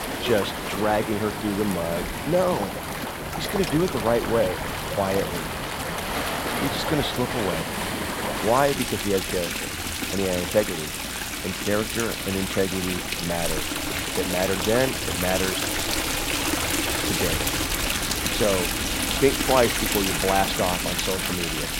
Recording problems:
rain or running water; loud; throughout; as loud as the speech

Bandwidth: 16 kHz